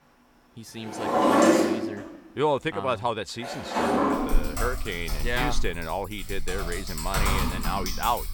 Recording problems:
household noises; very loud; throughout; 4 dB above the speech

